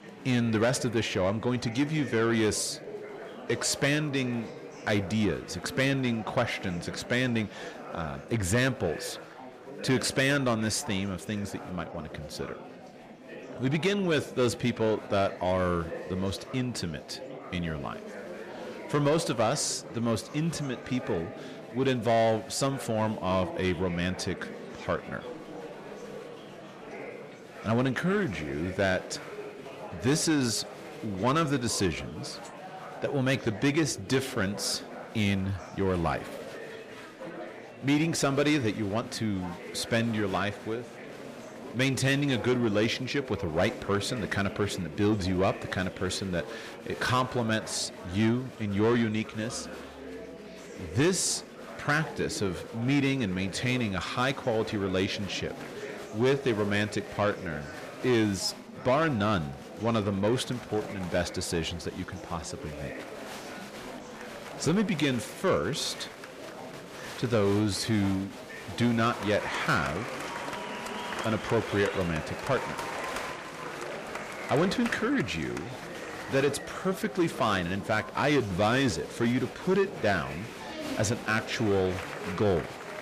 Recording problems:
distortion; slight; 10 dB below the speech
murmuring crowd; noticeable; throughout; 10 dB below the speech

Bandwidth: 14.5 kHz